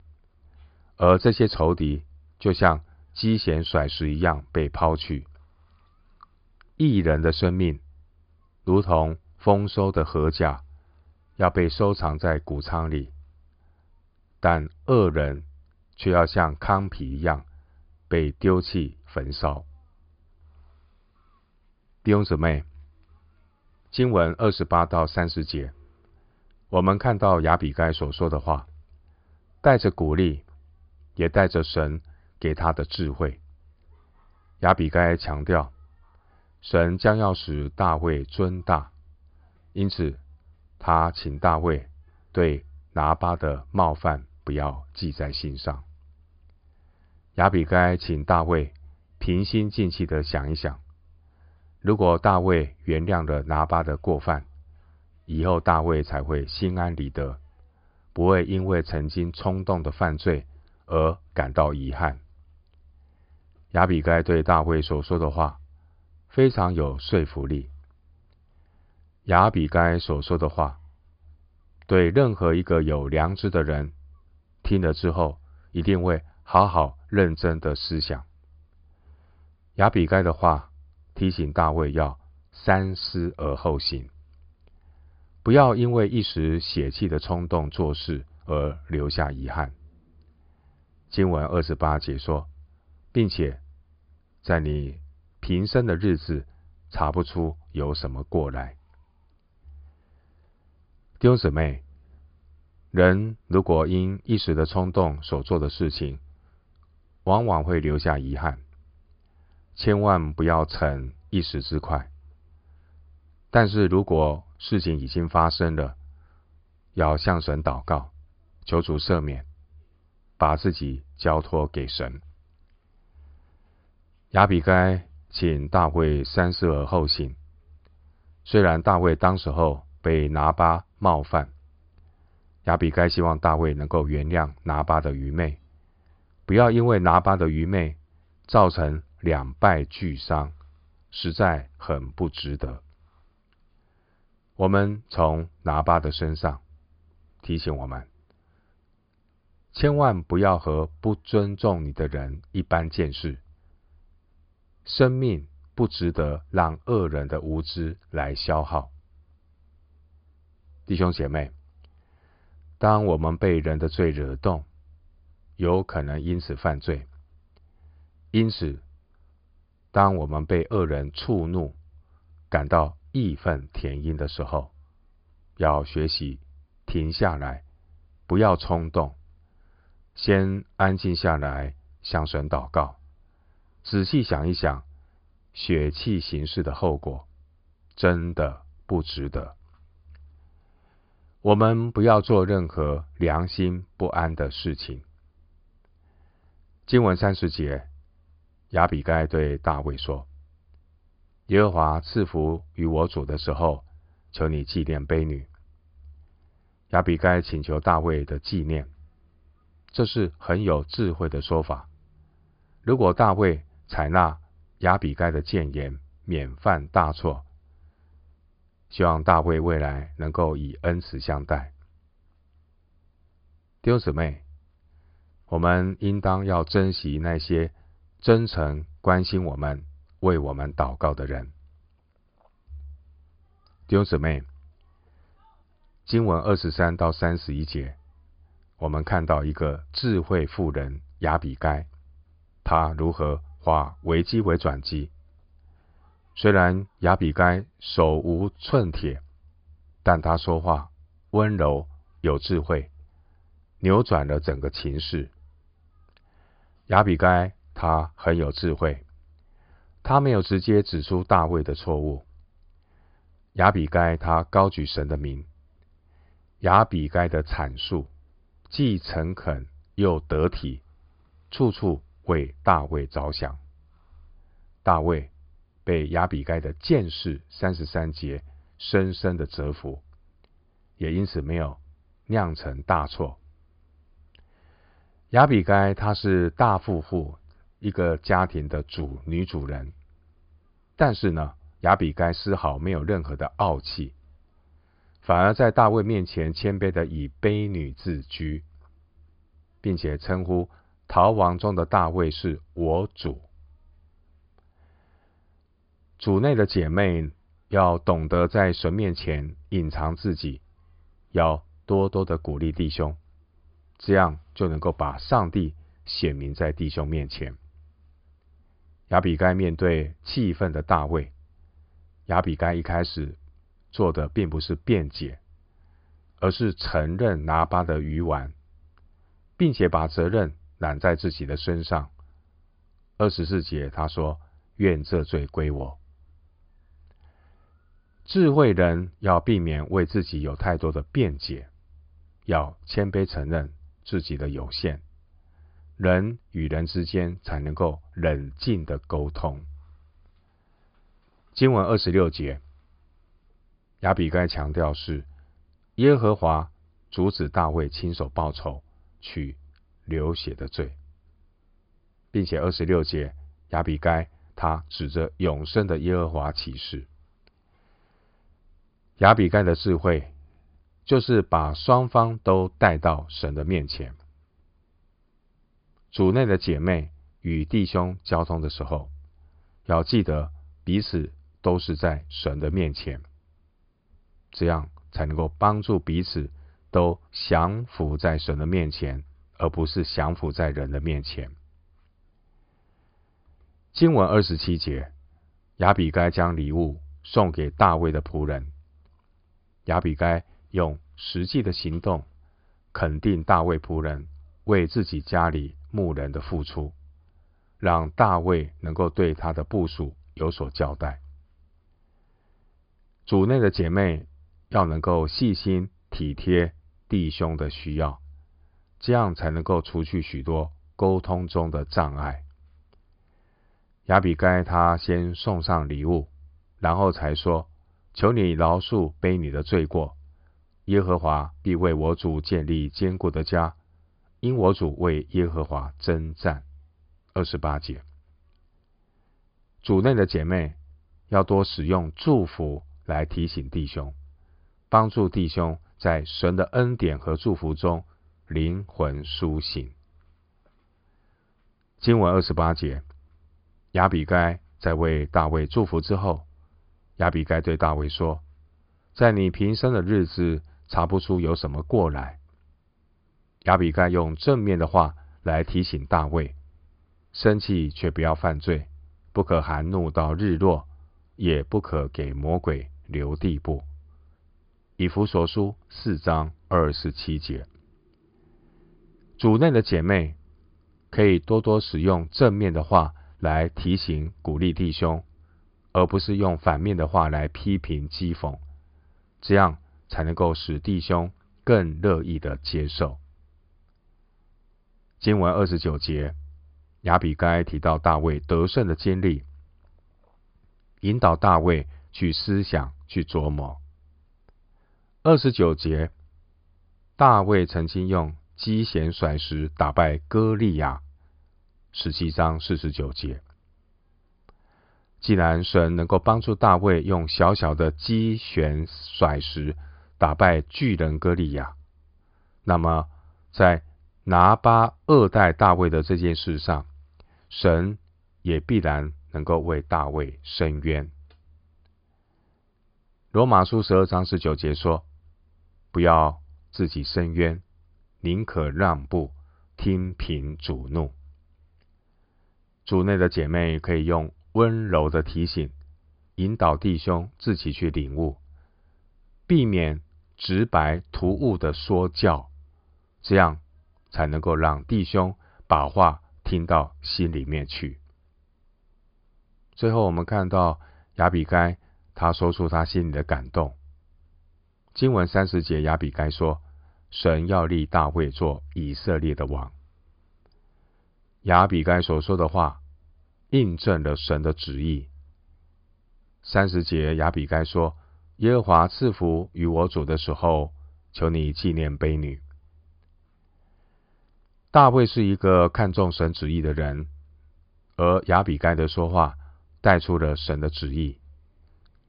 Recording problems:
high frequencies cut off; severe; nothing above 5 kHz

